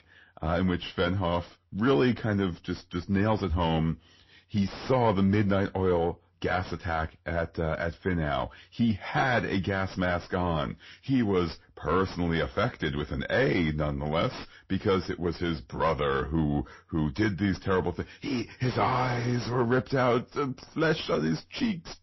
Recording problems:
distortion; slight; 9 dB below the speech
garbled, watery; slightly; nothing above 5.5 kHz

